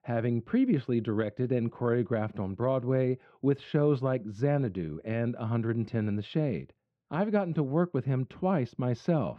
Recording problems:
muffled; very; fading above 1.5 kHz

